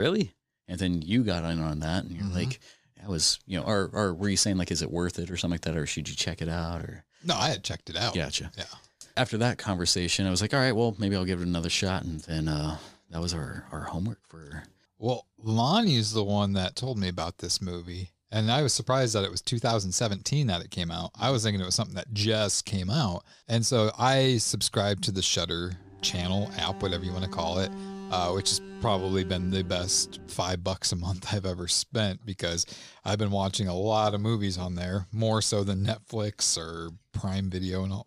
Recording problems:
abrupt cut into speech; at the start
alarm; faint; from 26 to 30 s; peak 10 dB below the speech

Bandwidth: 14.5 kHz